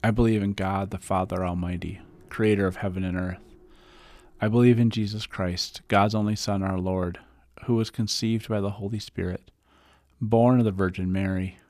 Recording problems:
none

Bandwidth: 14.5 kHz